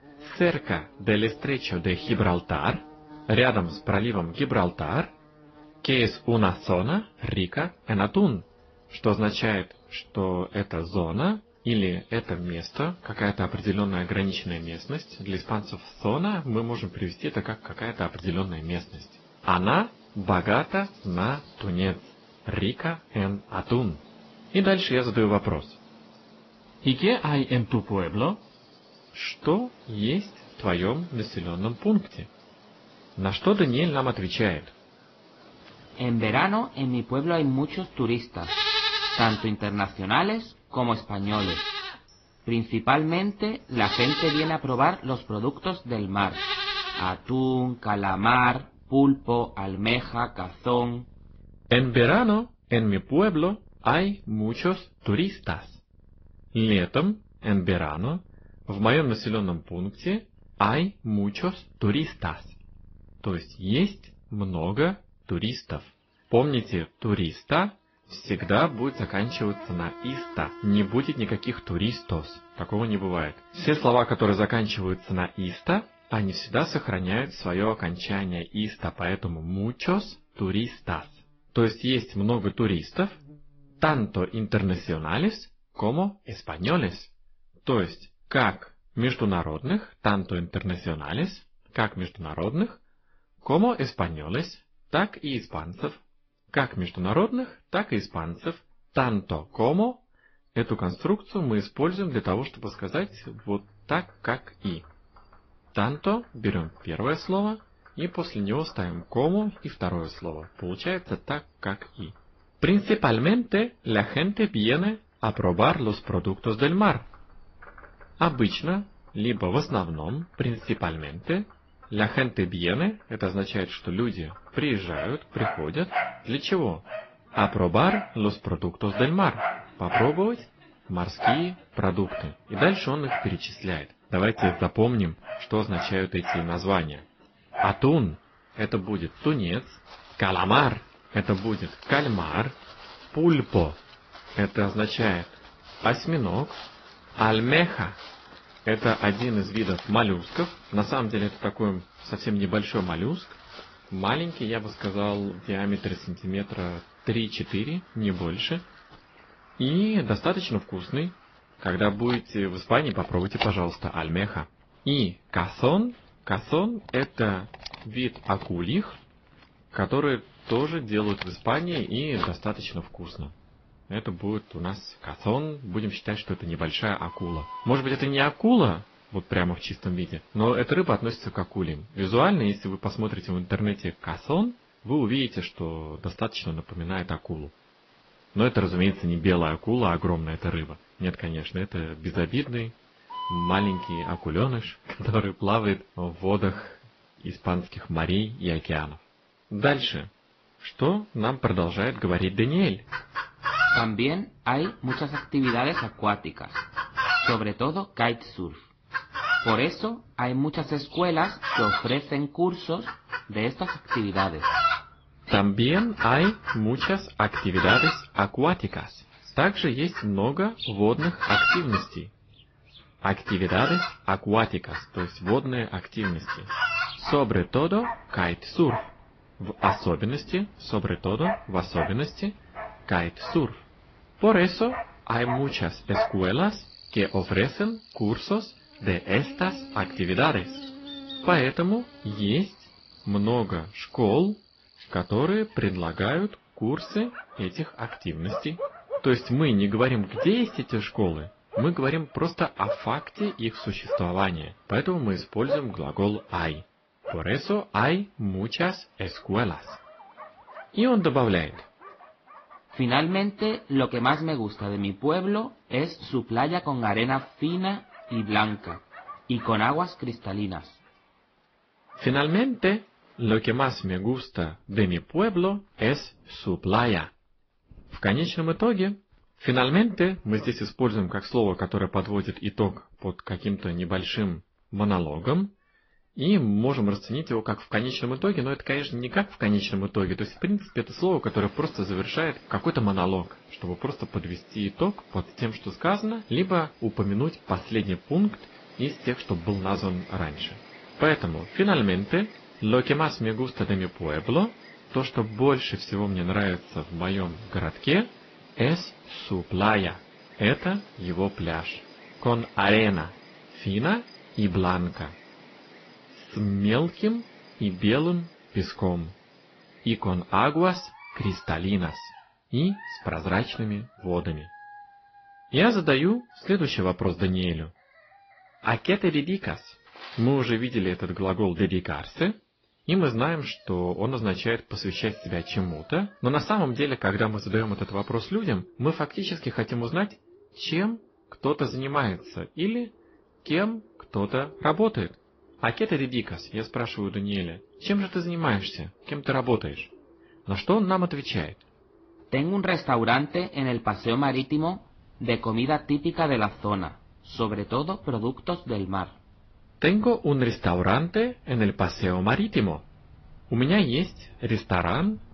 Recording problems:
high frequencies cut off; noticeable; nothing above 5.5 kHz
garbled, watery; slightly
animal sounds; loud; throughout; 7 dB below the speech

